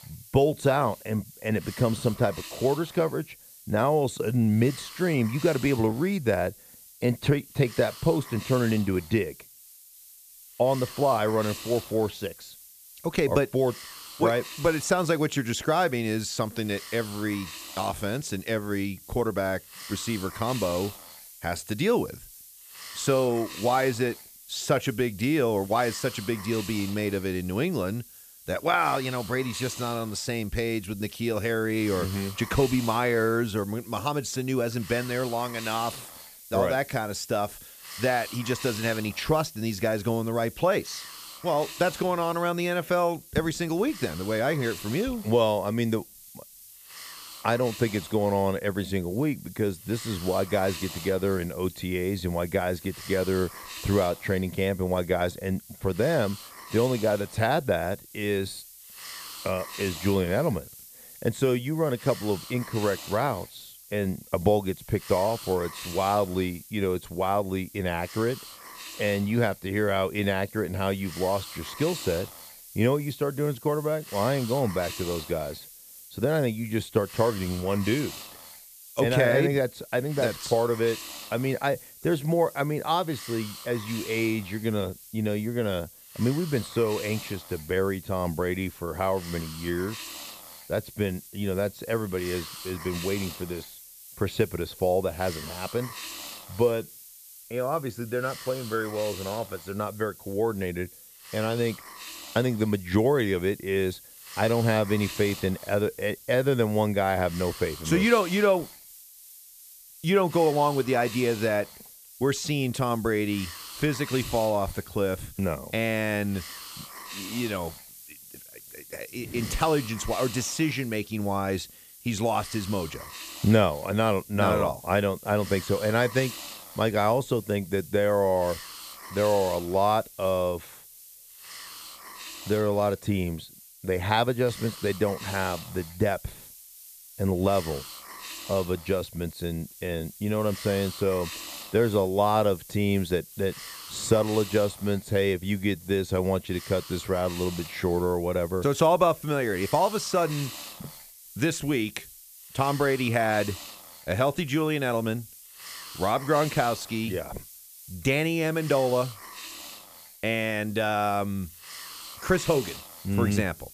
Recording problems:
hiss; noticeable; throughout; 15 dB below the speech

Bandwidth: 14.5 kHz